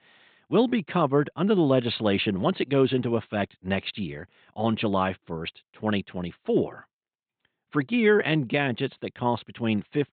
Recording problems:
high frequencies cut off; severe; nothing above 4 kHz

